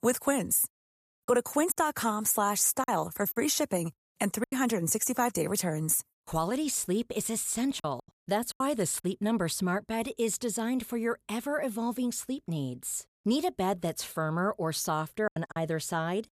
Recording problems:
choppy; occasionally; 4% of the speech affected

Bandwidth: 14.5 kHz